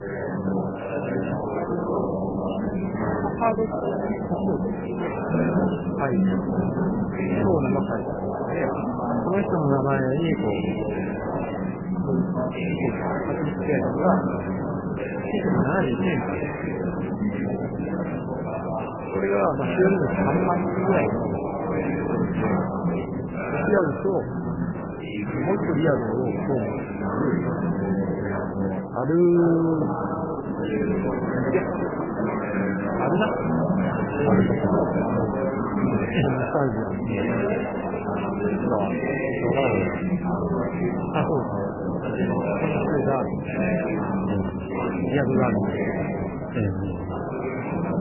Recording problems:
garbled, watery; badly; nothing above 3 kHz
chatter from many people; very loud; throughout; as loud as the speech
keyboard typing; faint; at 31 s; peak 15 dB below the speech

